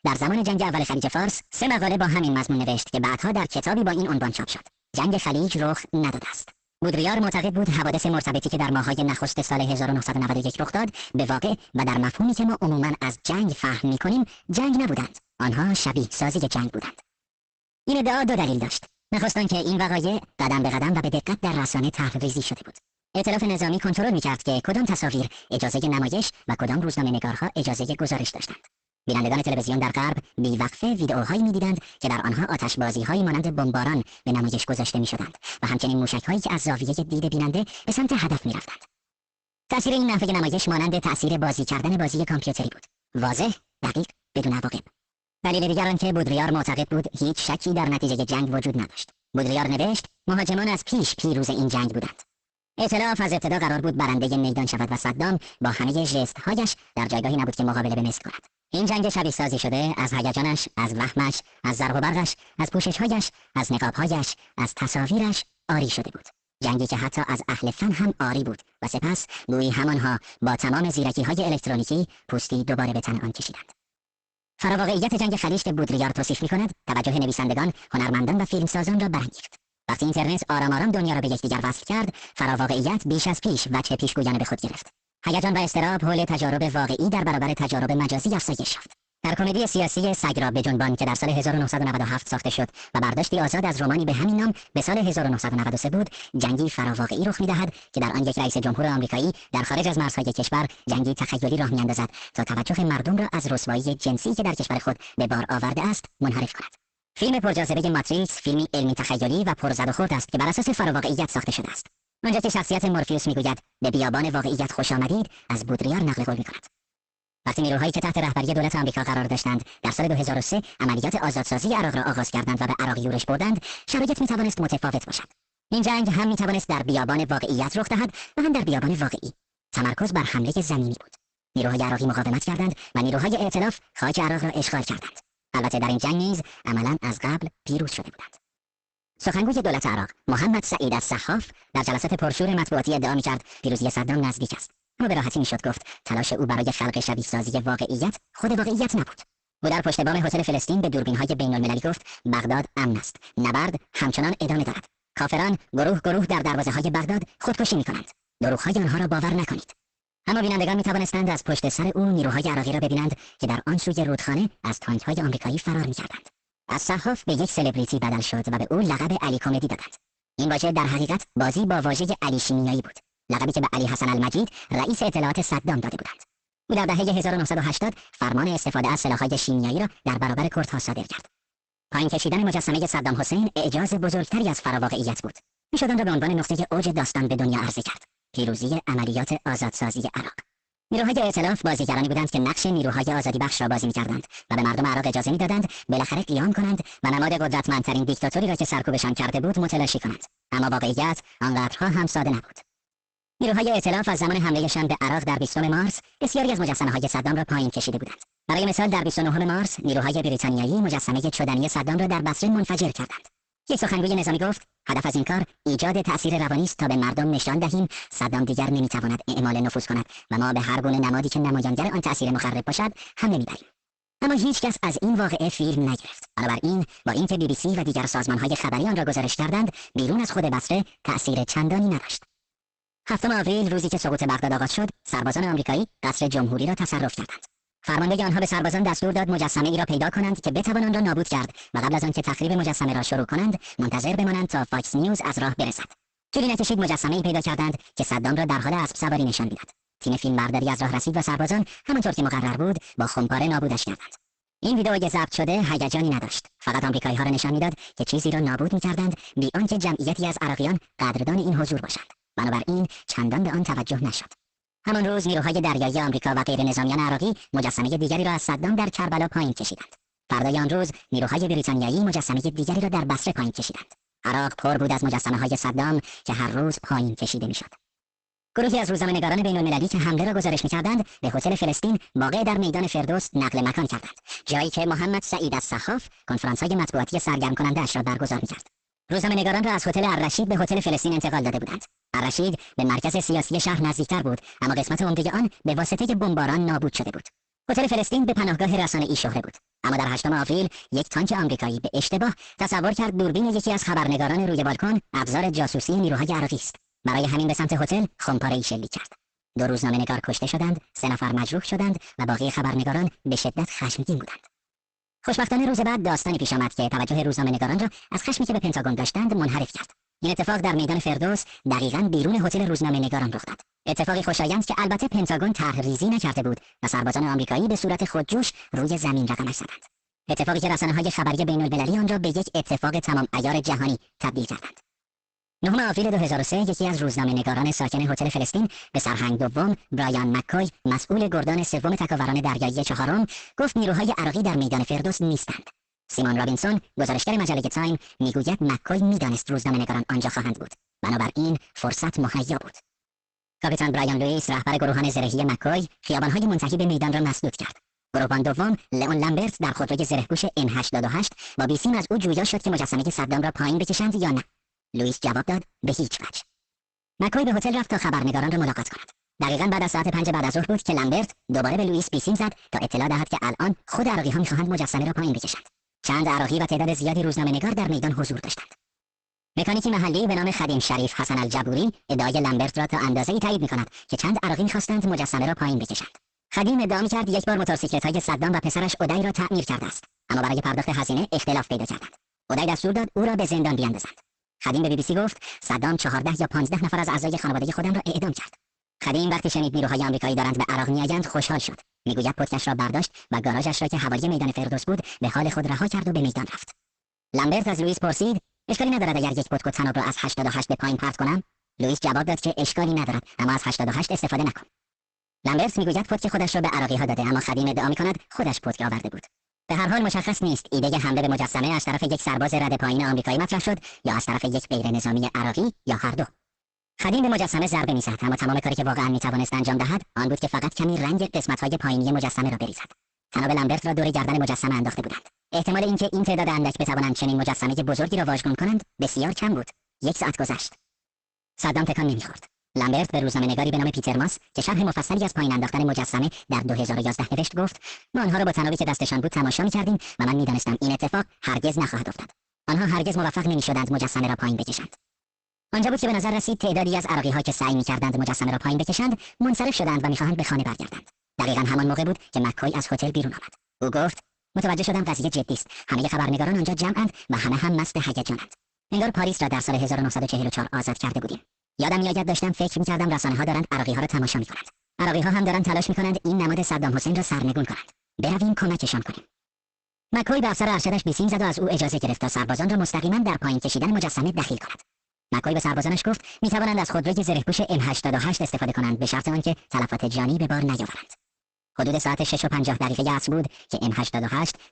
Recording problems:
garbled, watery; badly; nothing above 8 kHz
wrong speed and pitch; too fast and too high; 1.6 times normal speed
distortion; slight; 10 dB below the speech

